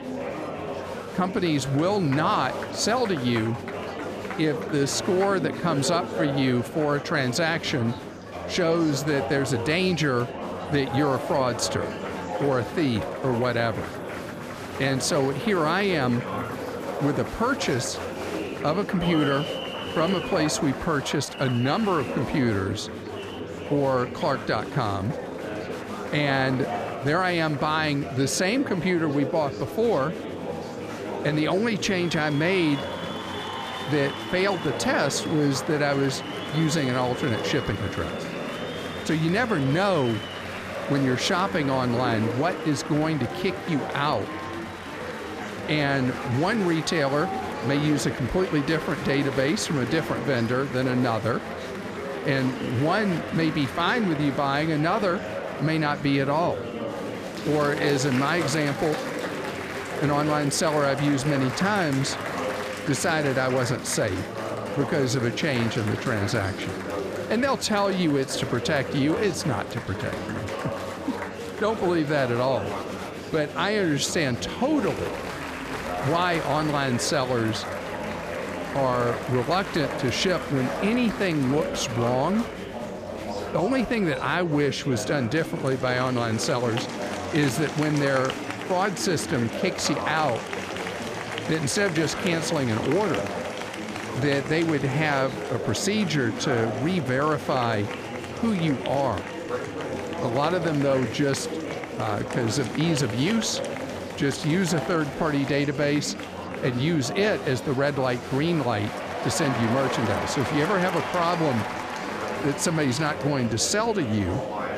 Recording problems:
murmuring crowd; loud; throughout; 7 dB below the speech

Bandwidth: 14.5 kHz